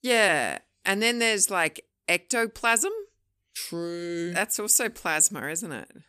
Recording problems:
none

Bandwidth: 14.5 kHz